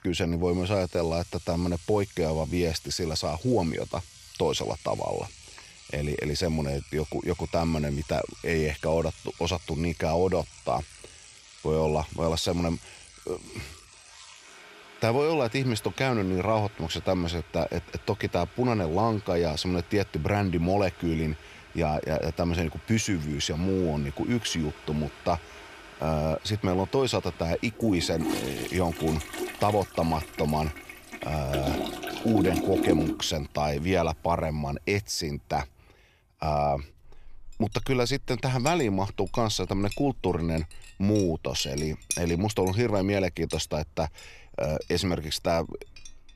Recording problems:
household noises; noticeable; throughout; 10 dB below the speech

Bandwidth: 14.5 kHz